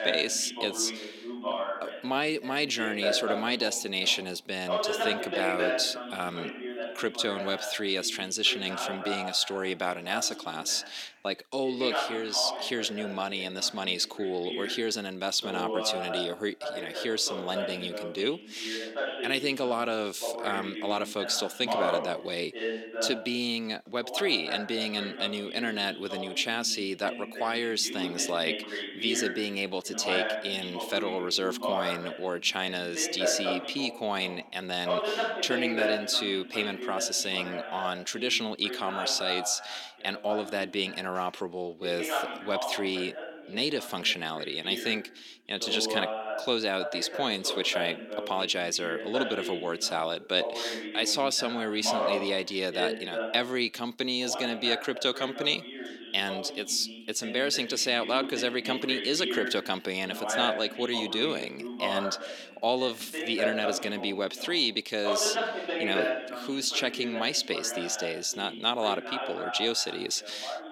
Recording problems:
thin; somewhat; fading below 300 Hz
voice in the background; loud; throughout; 6 dB below the speech

